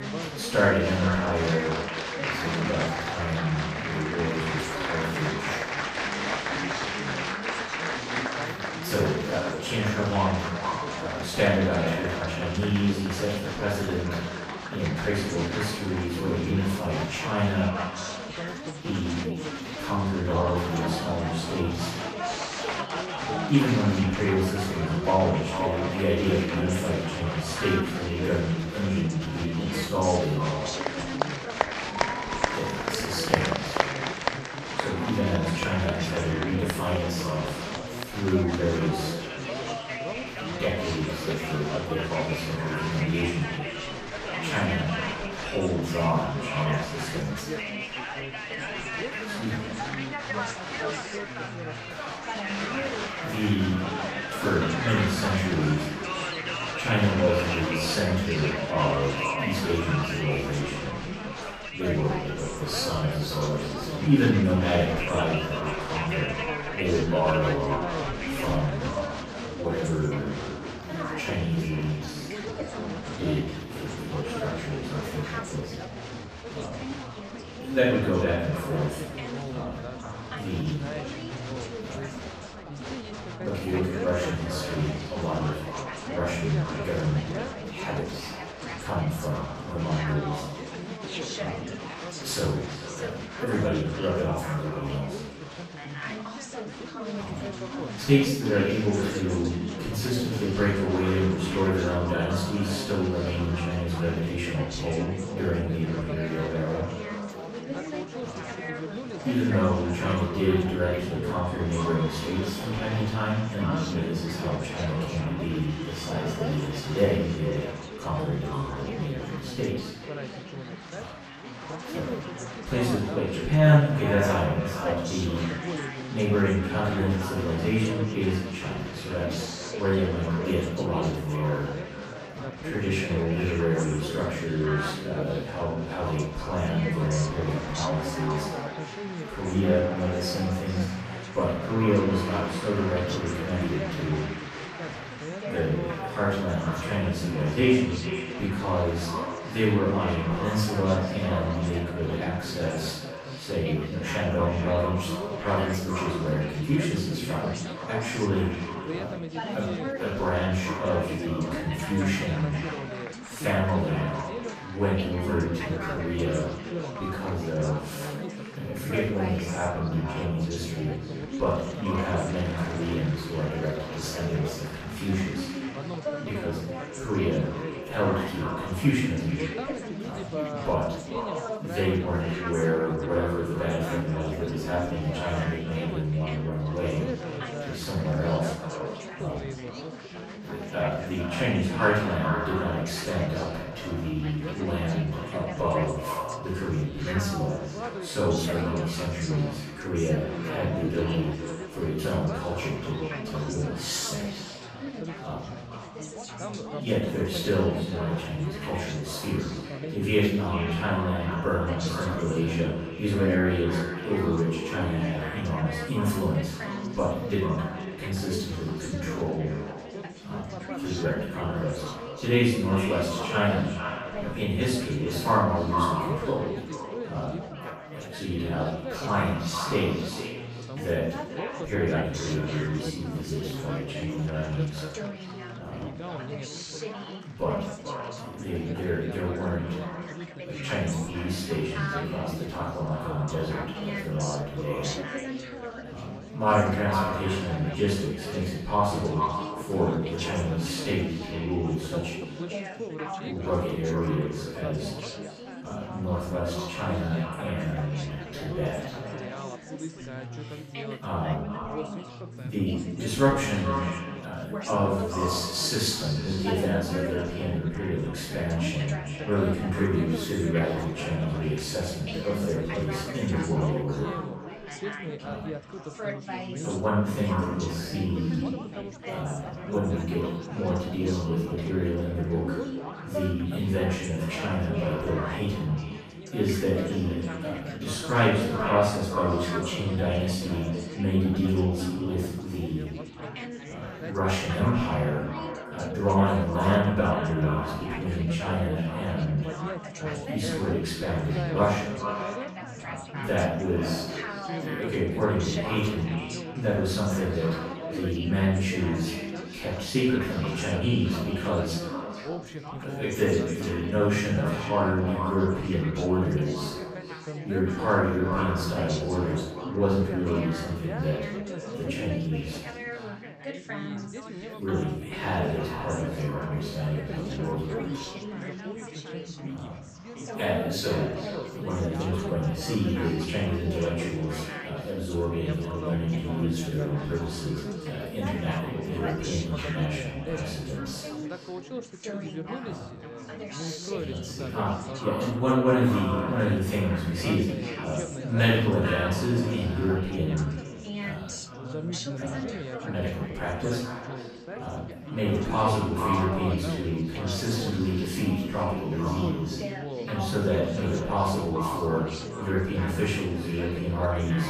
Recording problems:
echo of what is said; strong; throughout; 440 ms later, 10 dB below the speech
off-mic speech; far
room echo; noticeable; dies away in 0.7 s
chatter from many people; loud; throughout; 7 dB below the speech

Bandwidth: 14.5 kHz